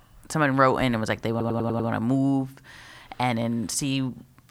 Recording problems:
audio stuttering; at 1.5 s

